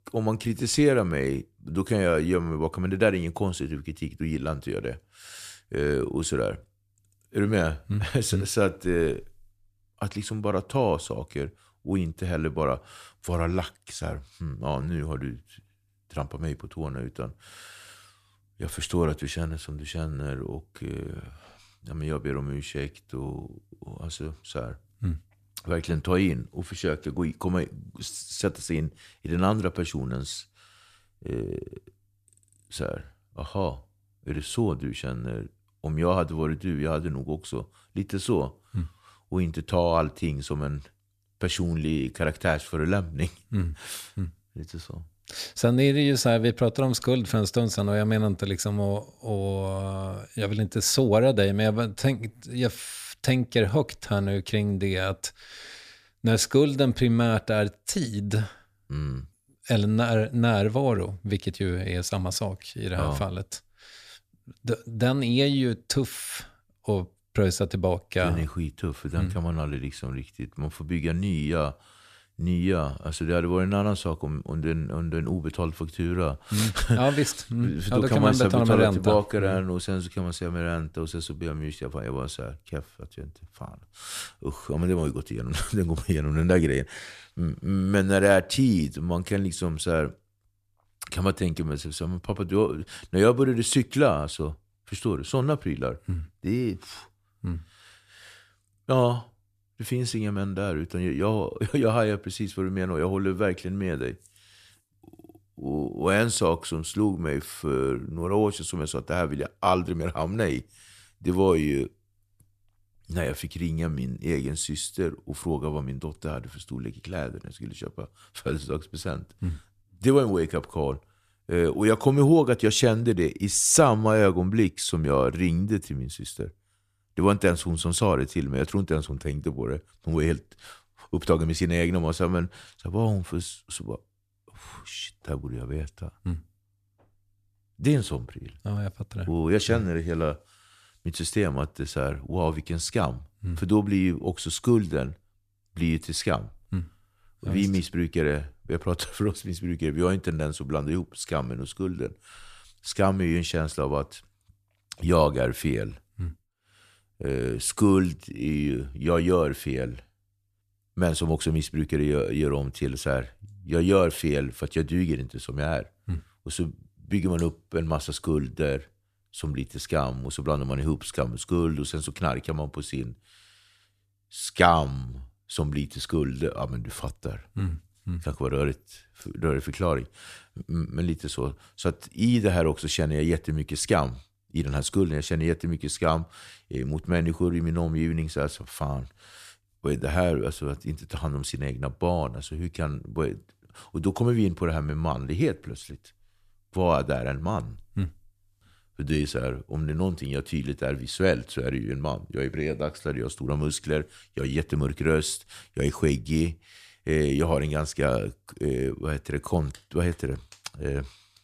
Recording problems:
none

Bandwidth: 14.5 kHz